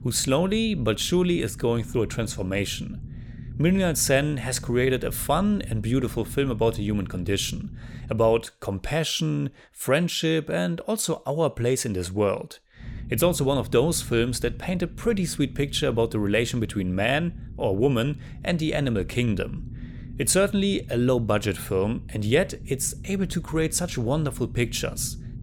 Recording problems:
low rumble; faint; until 8.5 s and from 13 s on; 25 dB below the speech

